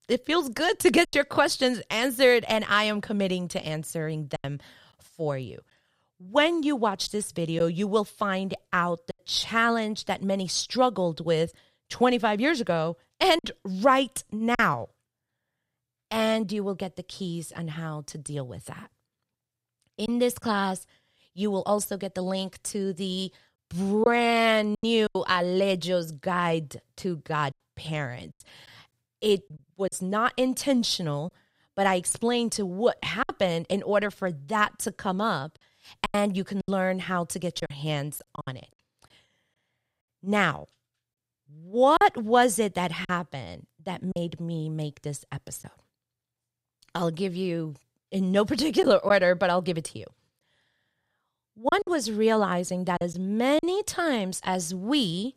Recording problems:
choppy; occasionally; 4% of the speech affected

